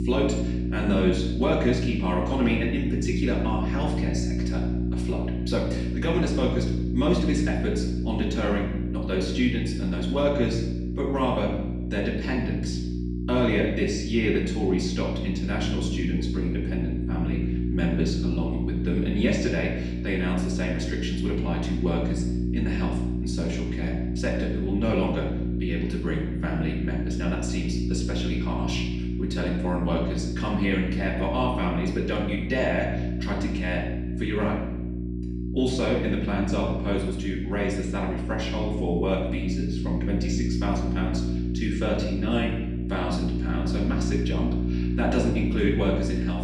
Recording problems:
off-mic speech; far
room echo; noticeable; dies away in 0.8 s
electrical hum; loud; throughout; 60 Hz, 6 dB below the speech

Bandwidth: 15 kHz